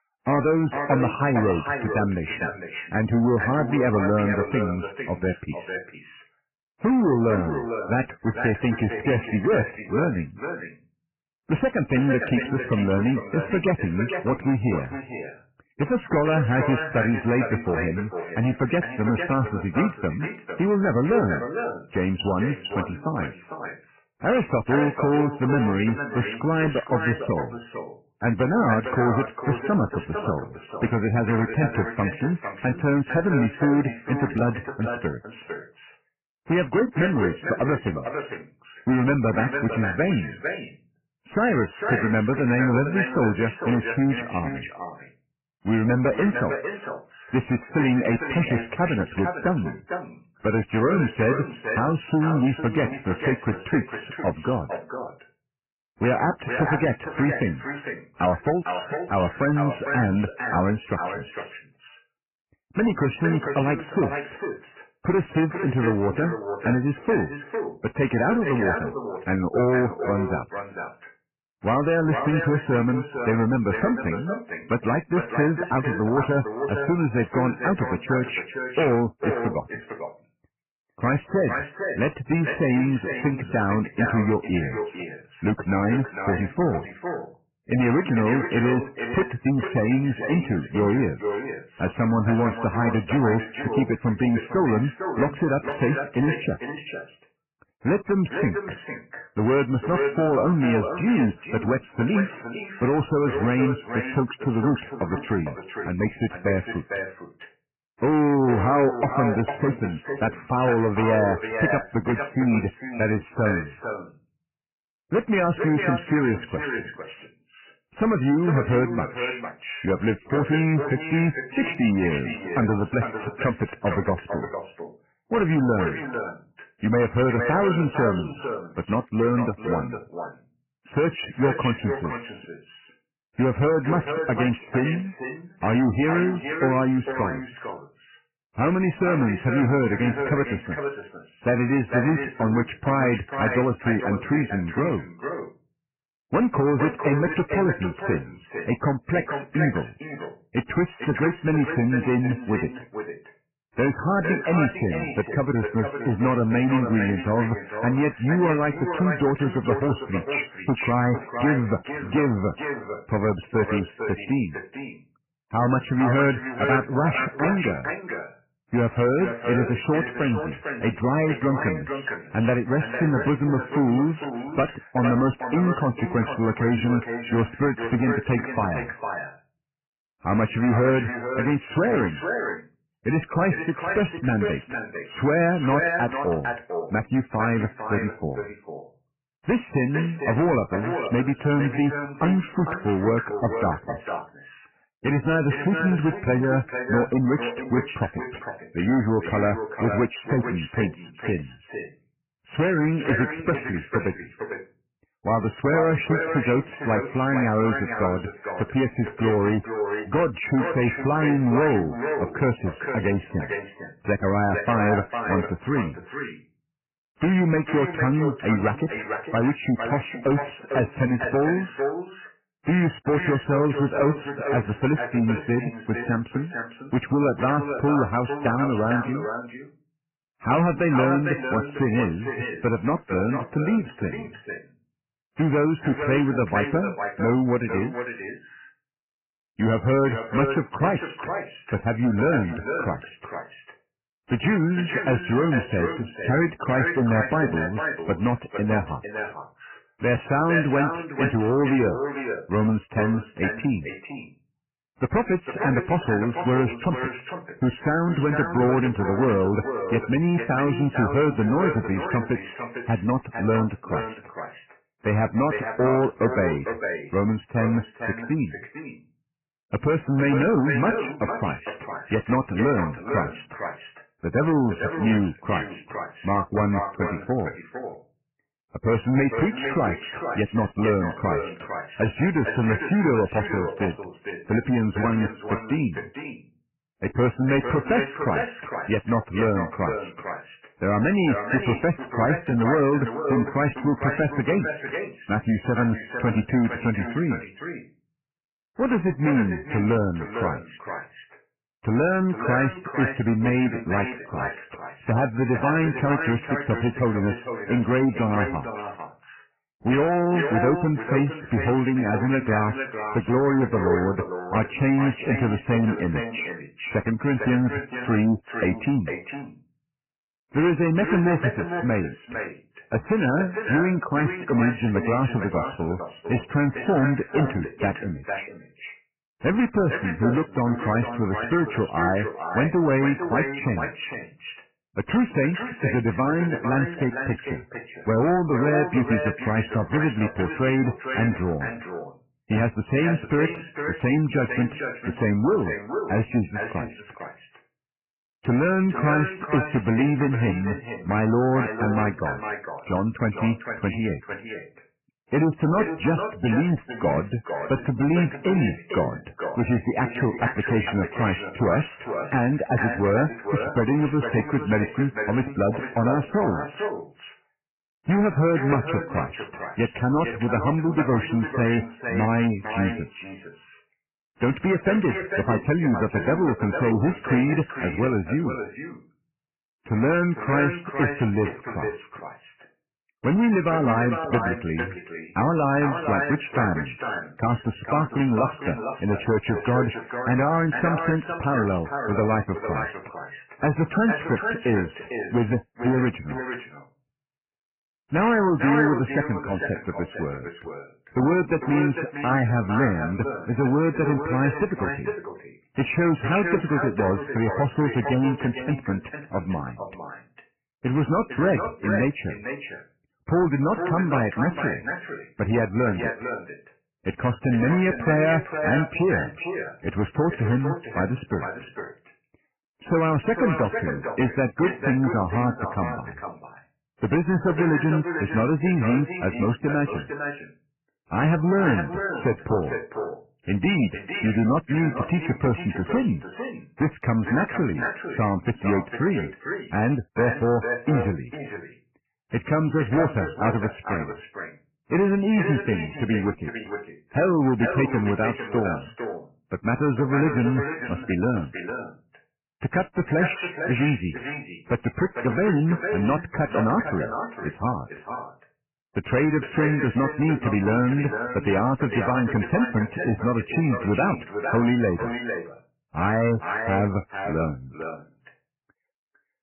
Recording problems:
echo of what is said; strong; throughout; 450 ms later, 7 dB below the speech
garbled, watery; badly; nothing above 3 kHz
distortion; slight; 8% of the sound clipped

